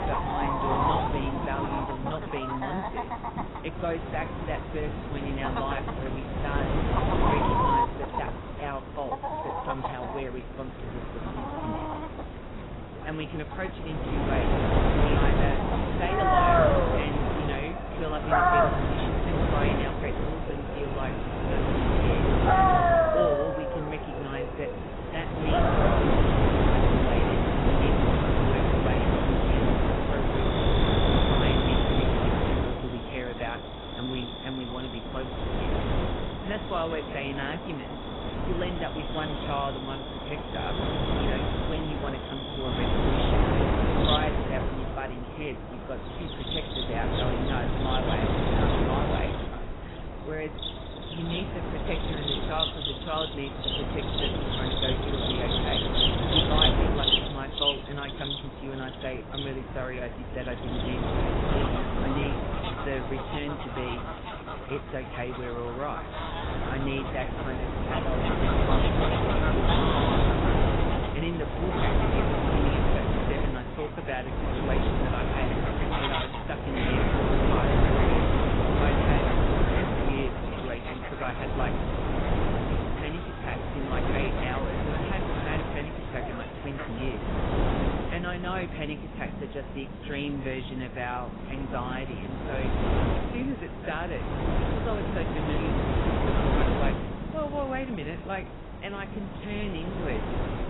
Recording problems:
garbled, watery; badly; nothing above 3.5 kHz
animal sounds; very loud; throughout; 3 dB above the speech
wind noise on the microphone; heavy; 4 dB above the speech

